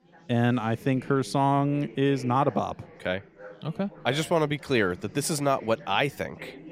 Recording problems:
chatter from many people; noticeable; throughout; 20 dB below the speech

